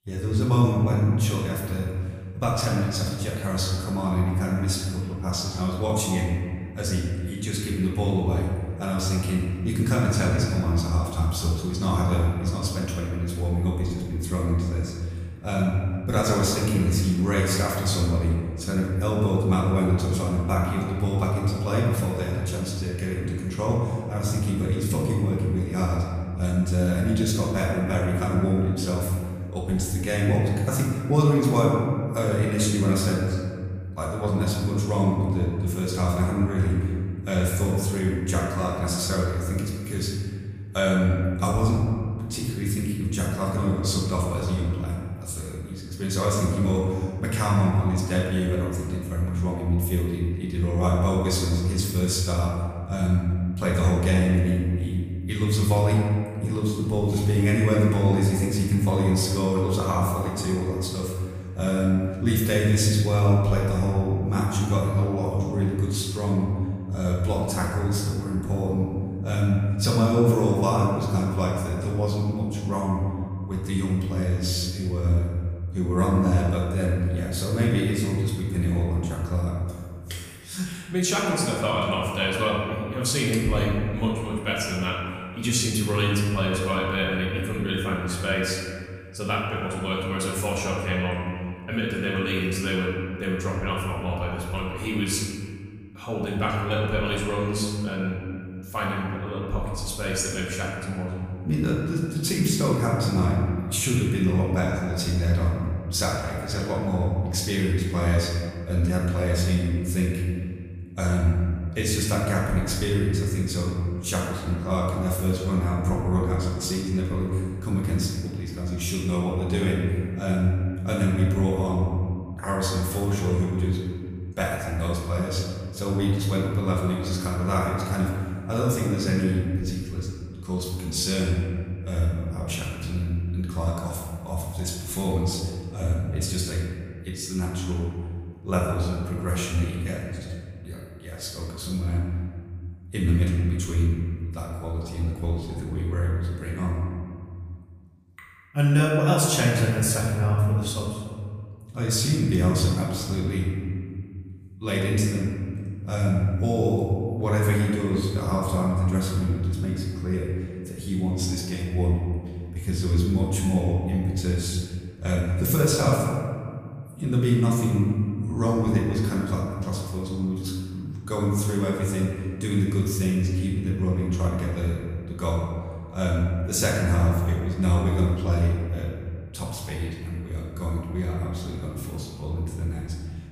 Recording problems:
off-mic speech; far
room echo; noticeable; dies away in 1.9 s

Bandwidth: 15 kHz